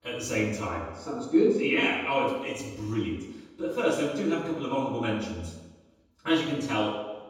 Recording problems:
off-mic speech; far
room echo; noticeable; dies away in 1.1 s

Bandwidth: 17 kHz